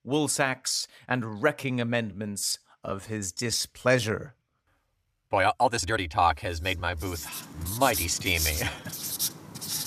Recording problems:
household noises; loud; from 7 s on; 4 dB below the speech
uneven, jittery; strongly; from 0.5 to 9 s

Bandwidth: 14.5 kHz